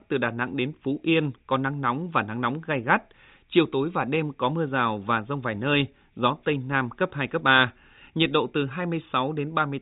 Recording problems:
high frequencies cut off; severe; nothing above 4 kHz

